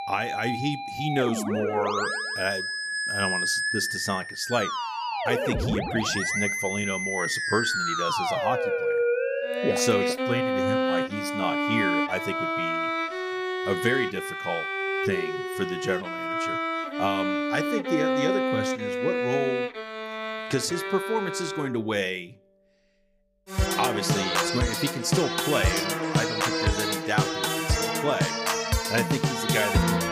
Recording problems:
background music; very loud; throughout; 3 dB above the speech

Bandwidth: 15 kHz